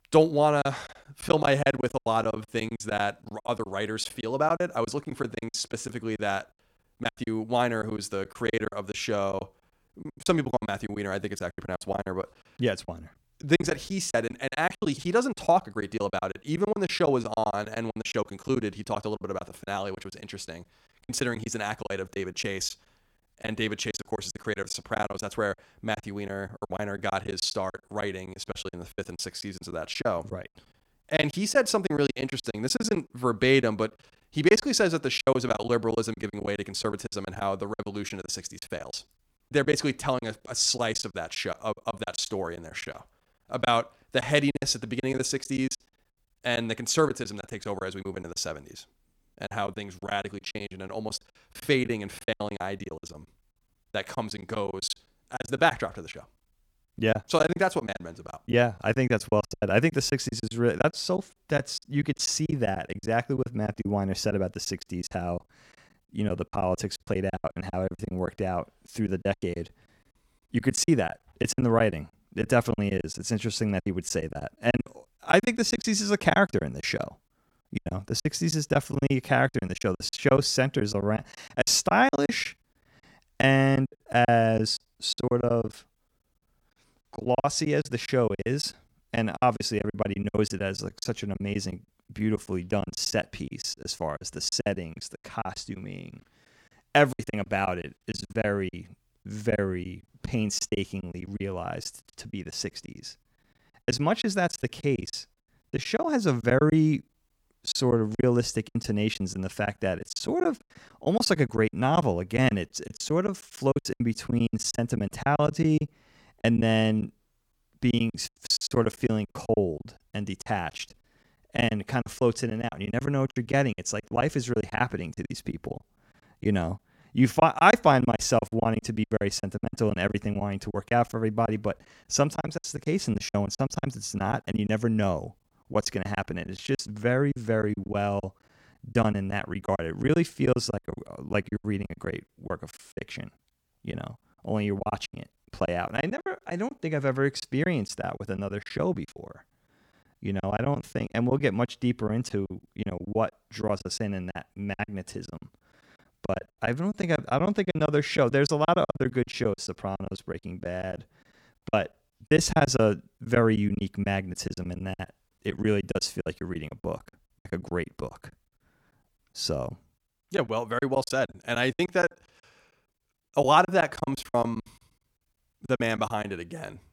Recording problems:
choppy; very; 15% of the speech affected

